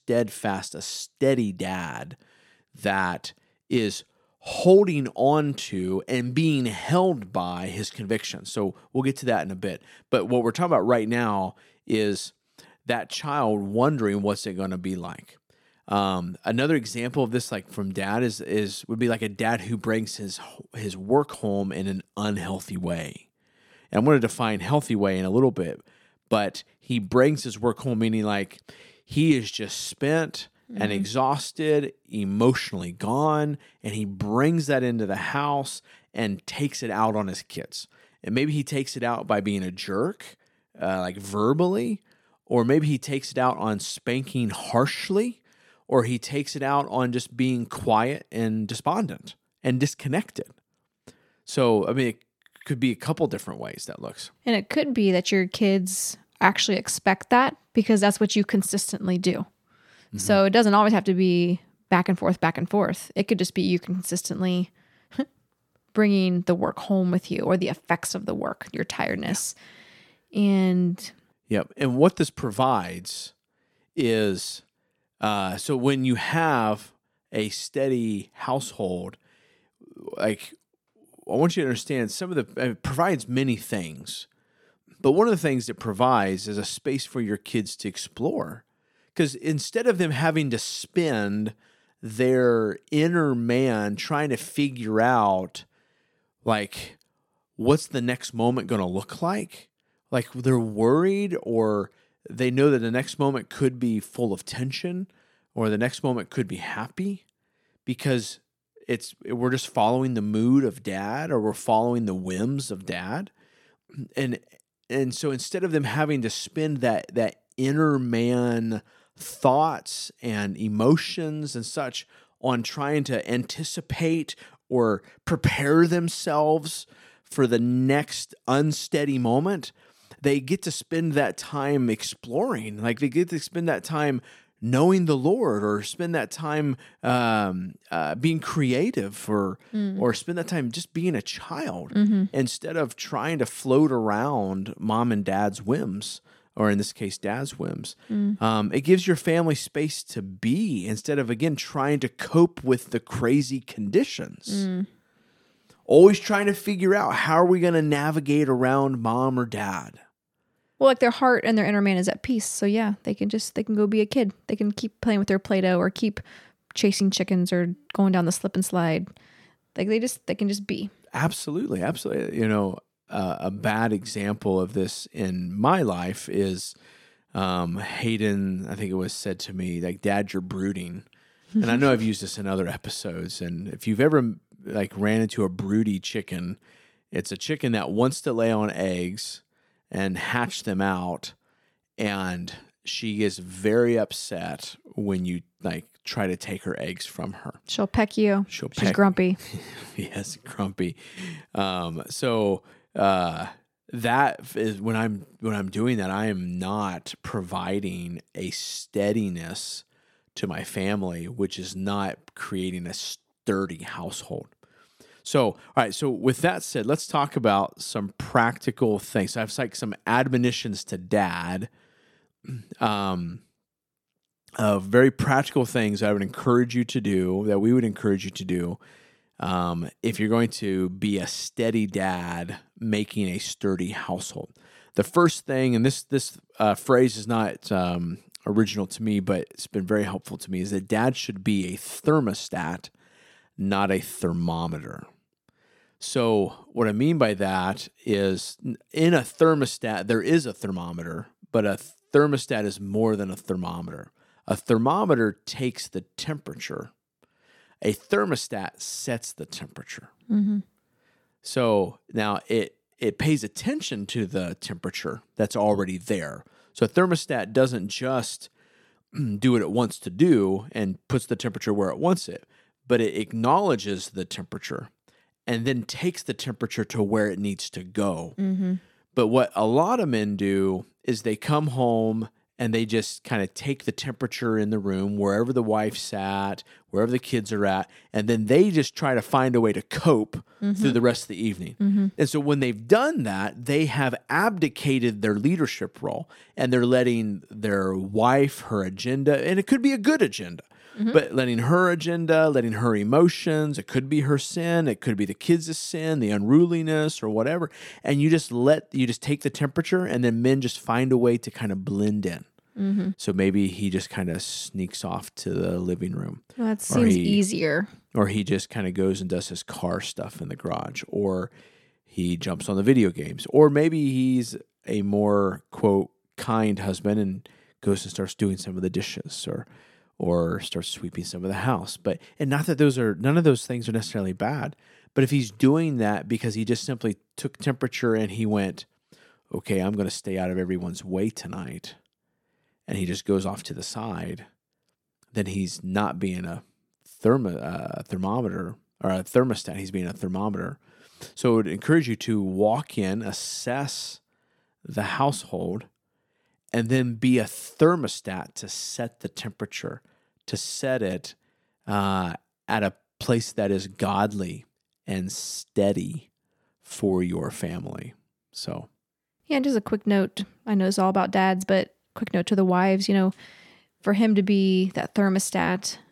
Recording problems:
none

